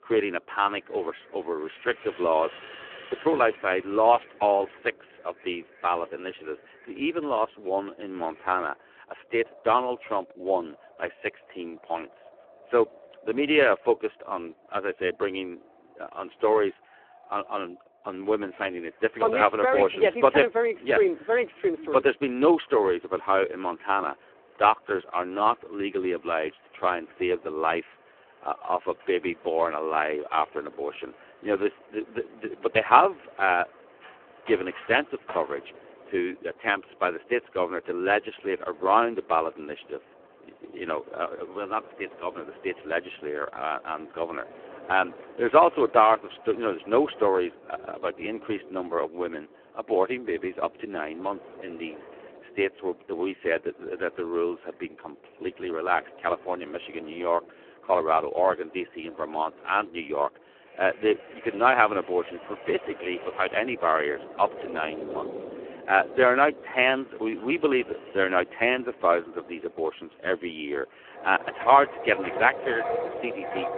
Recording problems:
phone-call audio; poor line
wind in the background; noticeable; throughout; 15 dB below the speech

